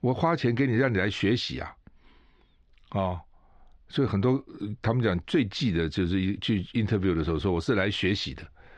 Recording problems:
muffled; slightly; fading above 4 kHz

